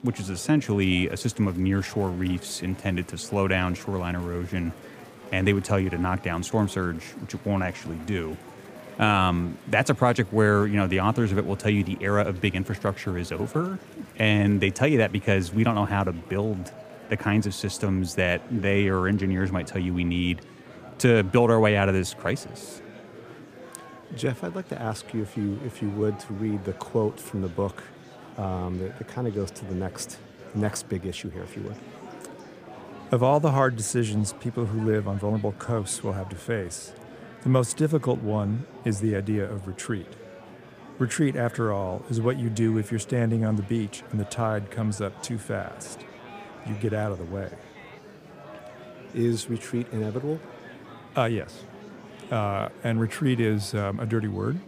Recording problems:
murmuring crowd; noticeable; throughout; 20 dB below the speech

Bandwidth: 15 kHz